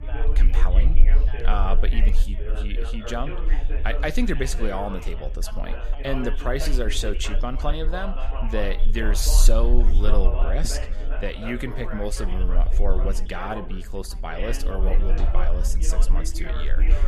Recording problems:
background chatter; loud; throughout; 4 voices, 8 dB below the speech
background music; noticeable; from 9.5 s on; 15 dB below the speech
low rumble; noticeable; throughout; 20 dB below the speech

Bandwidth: 14.5 kHz